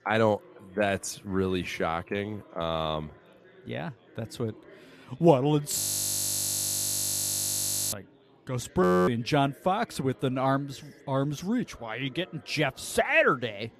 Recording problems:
chatter from many people; faint; throughout; 25 dB below the speech
audio freezing; at 6 s for 2 s and at 9 s

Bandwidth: 14.5 kHz